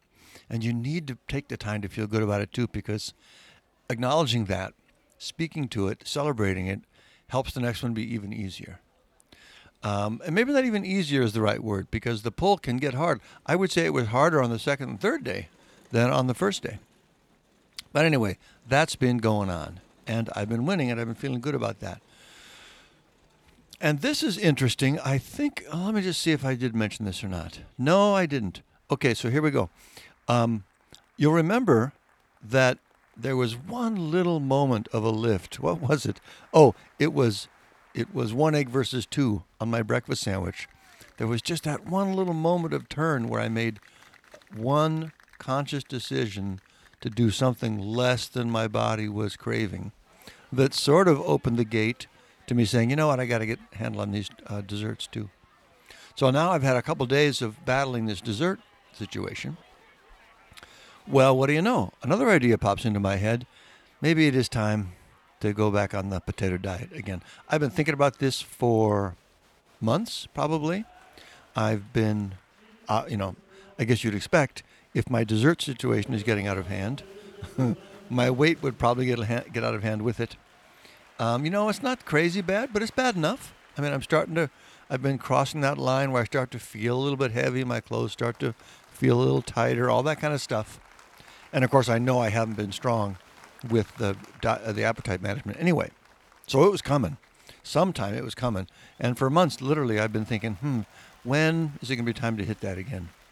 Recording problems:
crowd noise; faint; throughout; 30 dB below the speech

